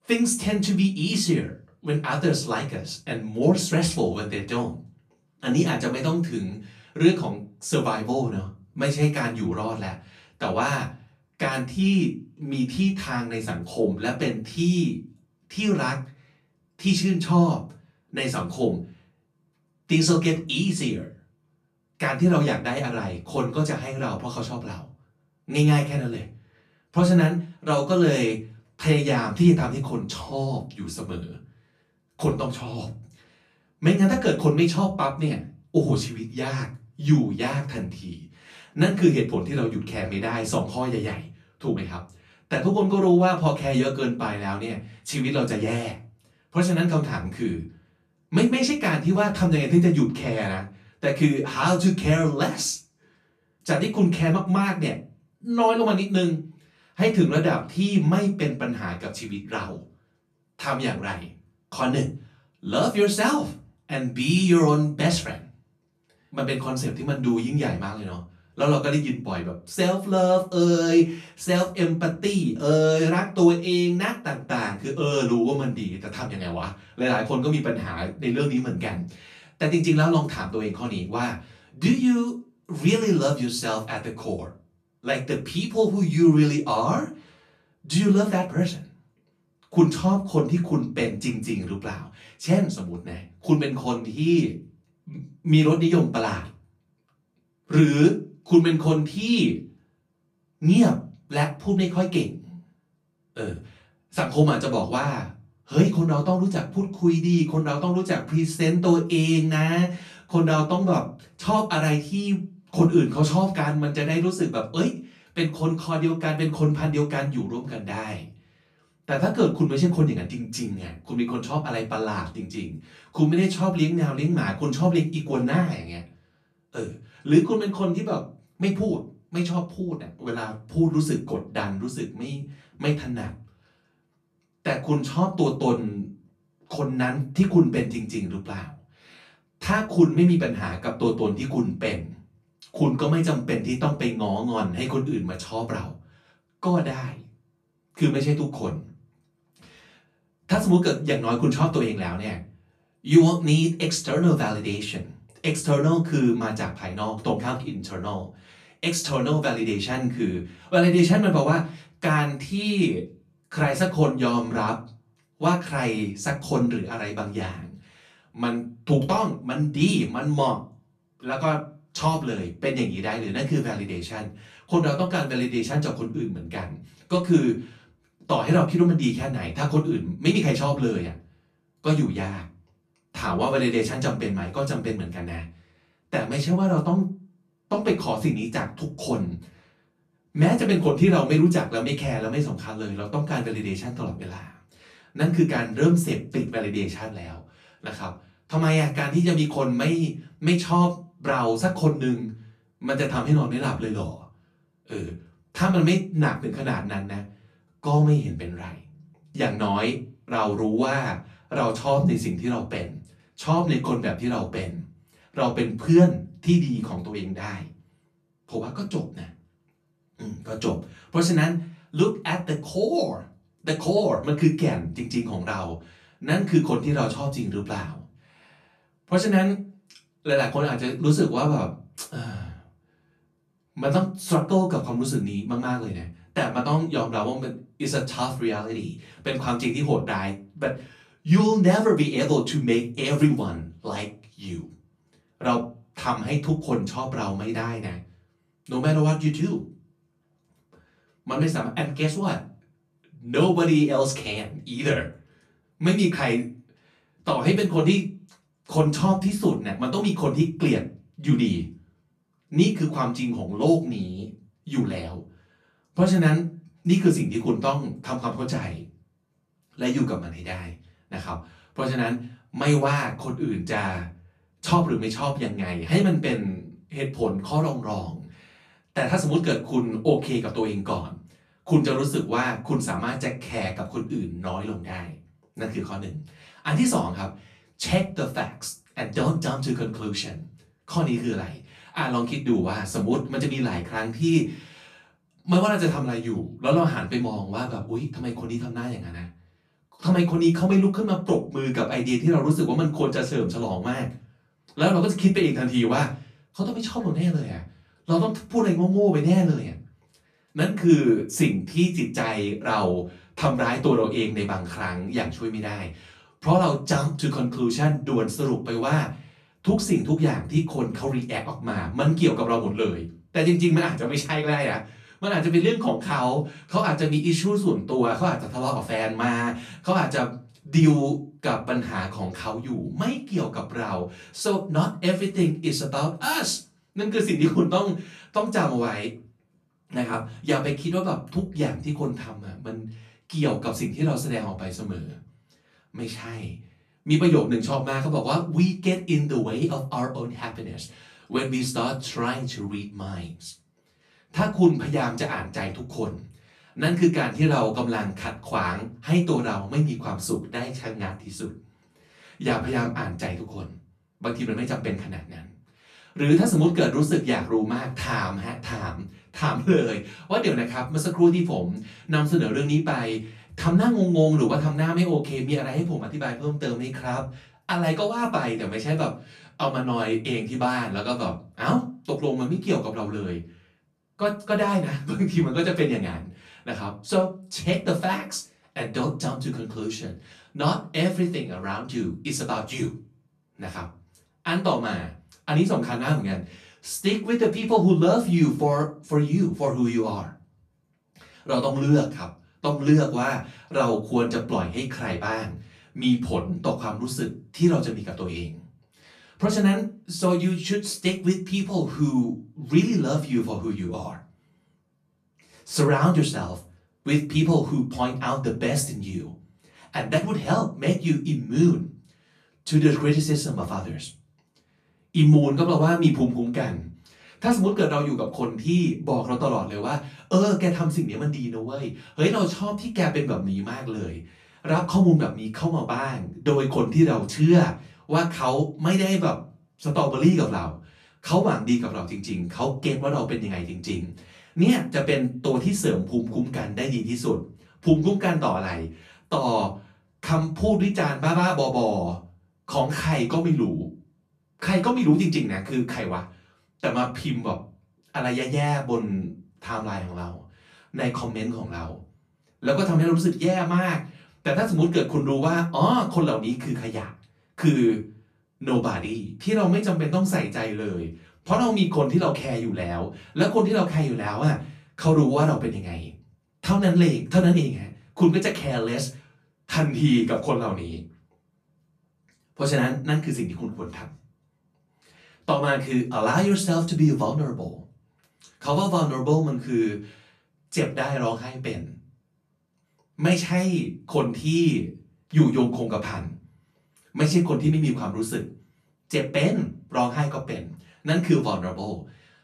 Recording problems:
off-mic speech; far
room echo; slight; dies away in 0.3 s

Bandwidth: 14 kHz